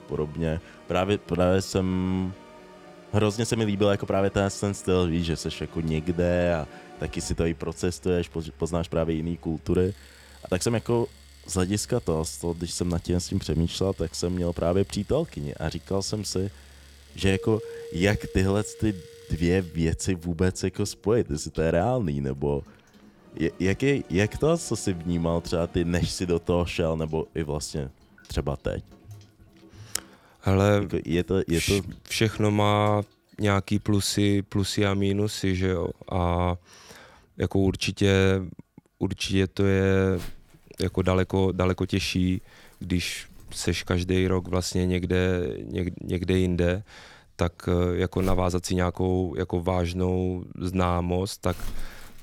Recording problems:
household noises; faint; throughout; 25 dB below the speech
background music; faint; until 26 s; 20 dB below the speech
uneven, jittery; strongly; from 1 to 51 s

